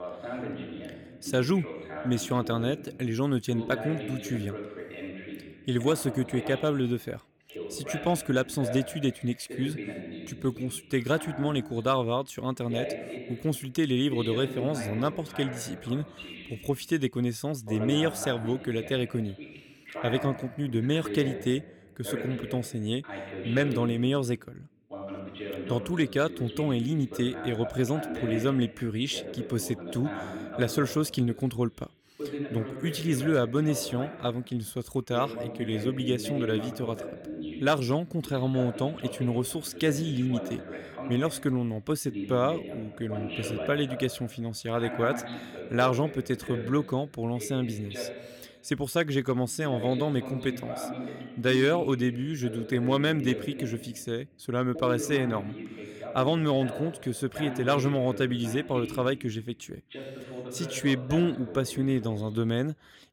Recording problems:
voice in the background; loud; throughout; 10 dB below the speech

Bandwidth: 17.5 kHz